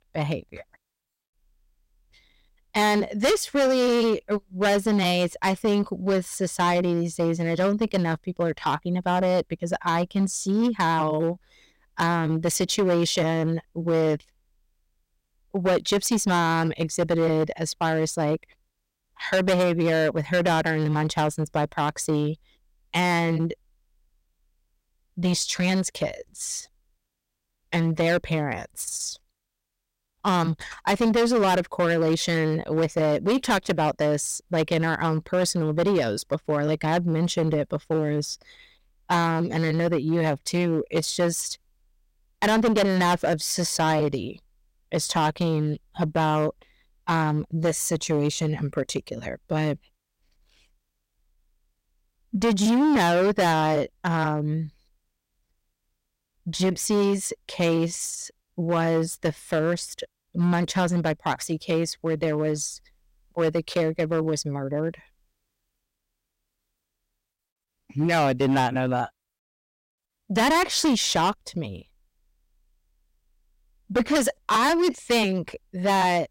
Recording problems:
distortion; heavy; 9% of the sound clipped

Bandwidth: 16 kHz